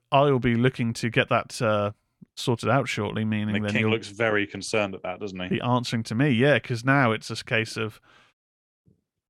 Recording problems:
none

